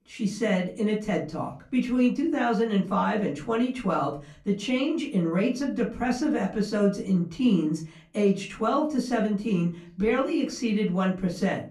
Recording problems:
off-mic speech; far
room echo; very slight; dies away in 0.3 s

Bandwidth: 15 kHz